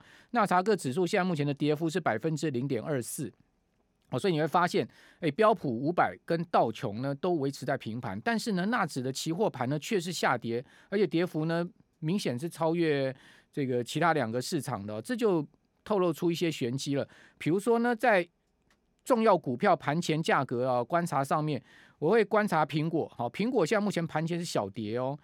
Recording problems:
none

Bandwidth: 17 kHz